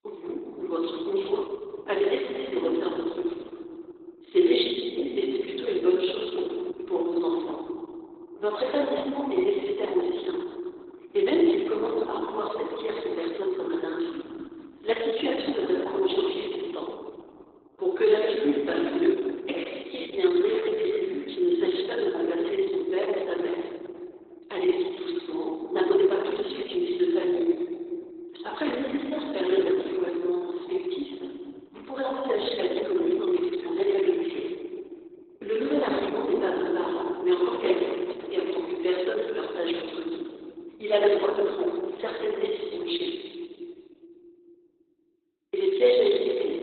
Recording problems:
garbled, watery; badly; nothing above 4 kHz
room echo; noticeable; dies away in 2.7 s
thin; somewhat; fading below 350 Hz
off-mic speech; somewhat distant
uneven, jittery; strongly; from 18 to 34 s

